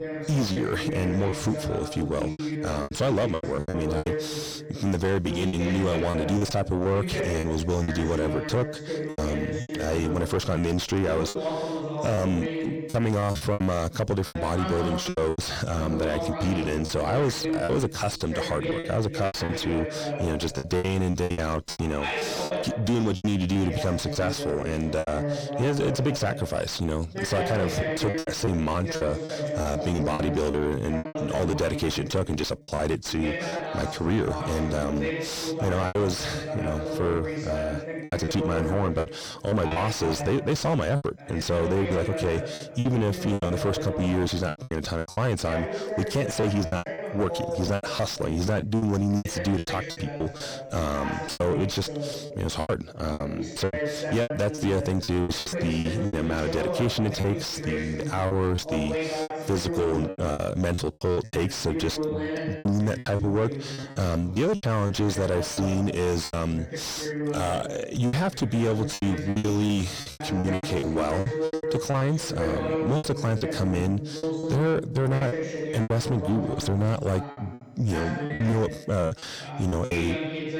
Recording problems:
distortion; heavy; 6 dB below the speech
voice in the background; loud; throughout; 5 dB below the speech
choppy; very; 11% of the speech affected

